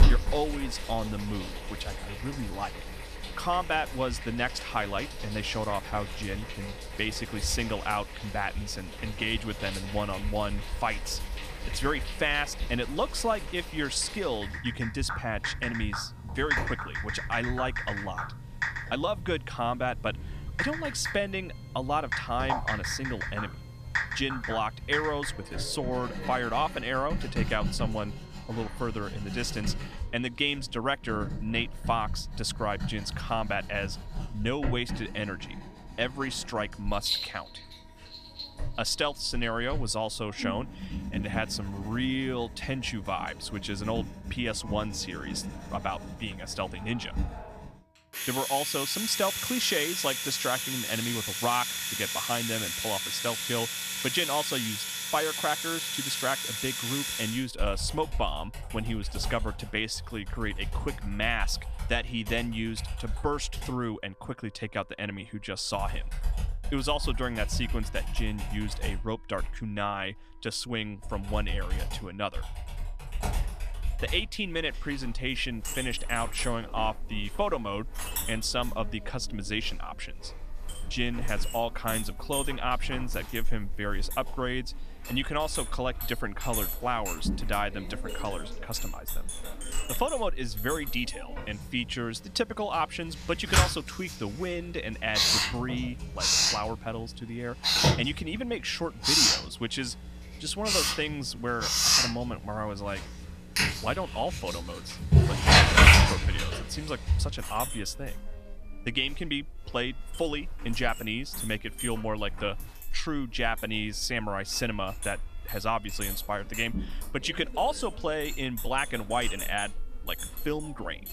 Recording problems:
household noises; very loud; throughout; 1 dB above the speech
background music; faint; throughout; 30 dB below the speech

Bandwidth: 14.5 kHz